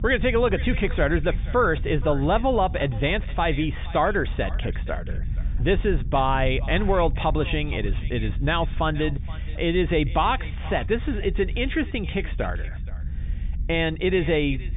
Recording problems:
high frequencies cut off; severe; nothing above 3.5 kHz
echo of what is said; faint; throughout; 470 ms later, 20 dB below the speech
low rumble; faint; throughout; 25 dB below the speech

